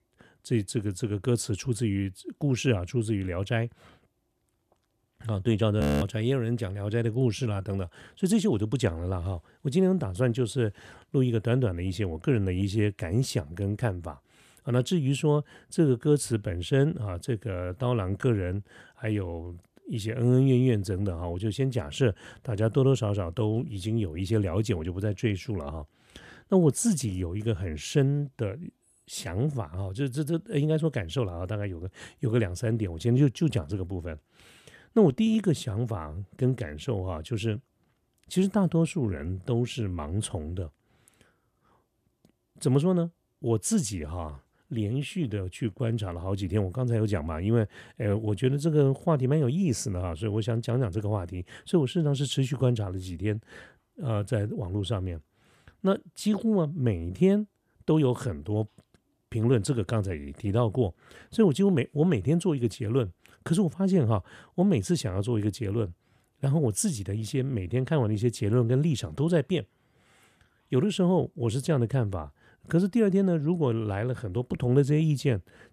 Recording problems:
audio freezing; at 6 s

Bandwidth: 14.5 kHz